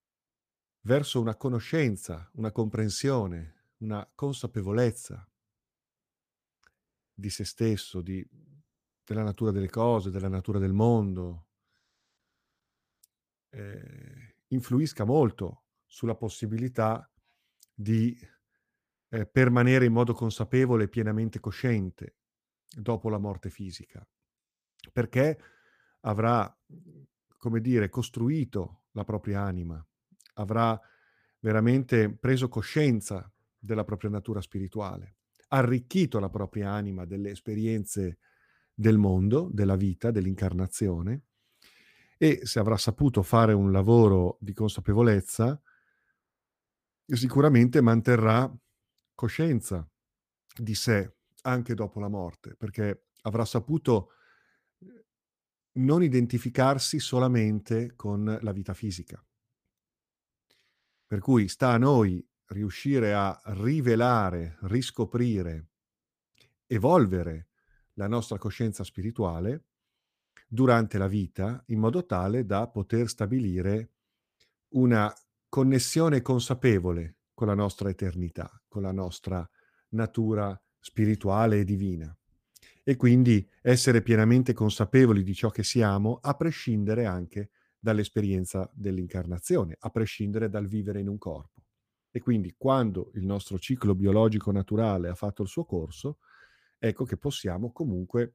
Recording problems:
none

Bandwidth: 15 kHz